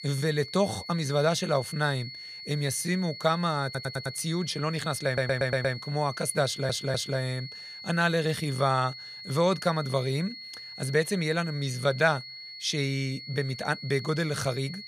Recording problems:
high-pitched whine; noticeable; throughout; 4.5 kHz, 10 dB below the speech
audio stuttering; at 3.5 s, at 5 s and at 6.5 s

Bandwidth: 15 kHz